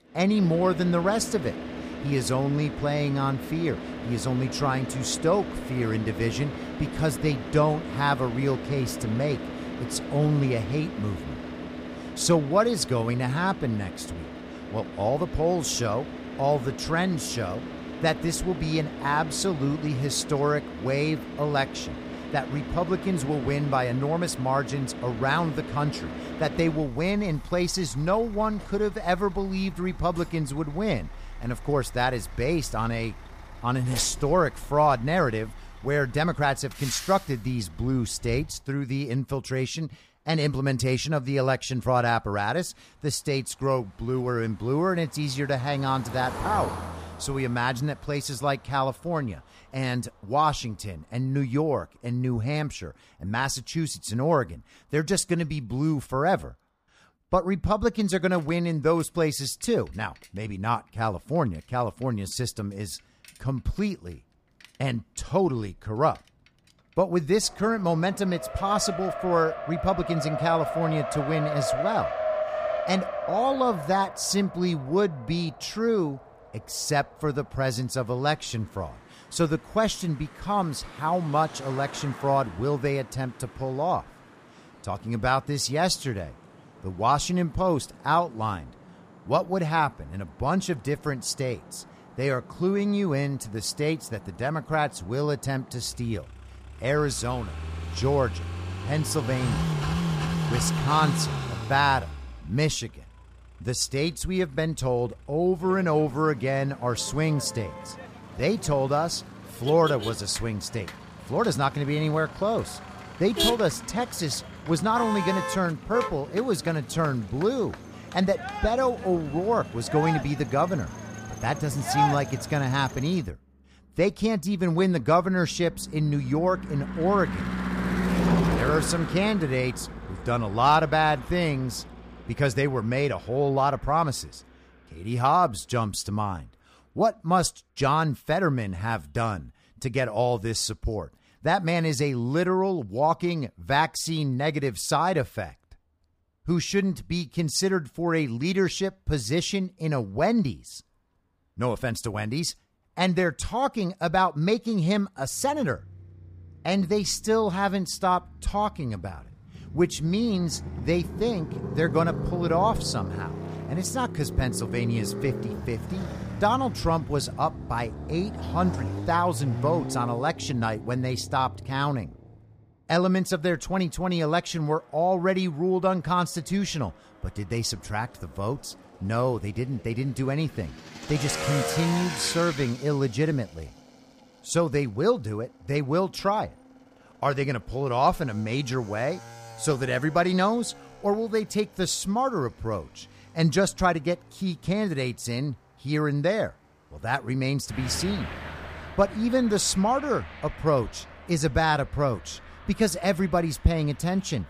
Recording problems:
traffic noise; loud; throughout; 8 dB below the speech

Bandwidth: 15 kHz